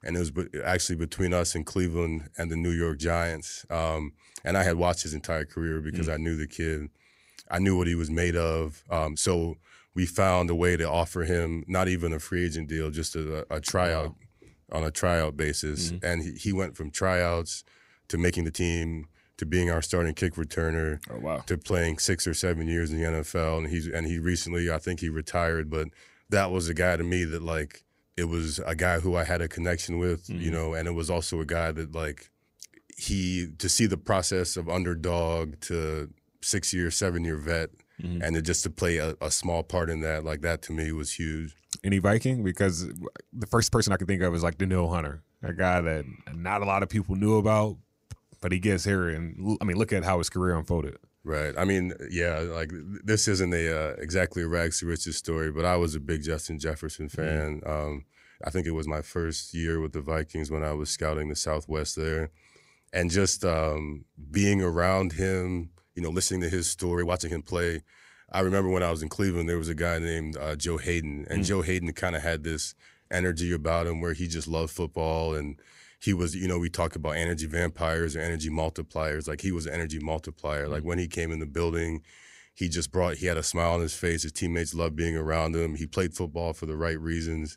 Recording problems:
uneven, jittery; strongly; from 9 s to 1:08

